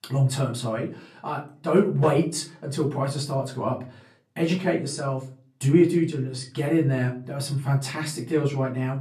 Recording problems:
off-mic speech; far
room echo; very slight; dies away in 0.3 s

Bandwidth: 14 kHz